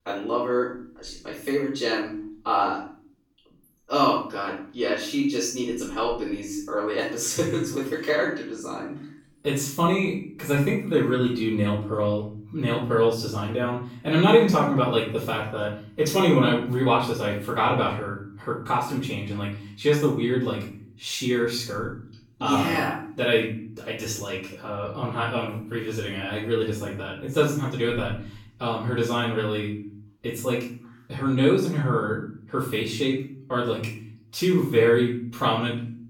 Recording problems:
off-mic speech; far
room echo; noticeable; dies away in 0.5 s

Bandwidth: 18 kHz